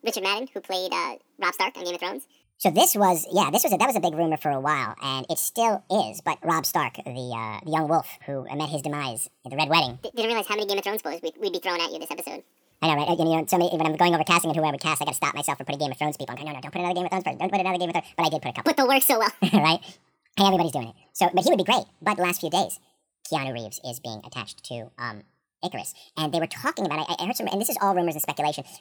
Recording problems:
wrong speed and pitch; too fast and too high; 1.6 times normal speed

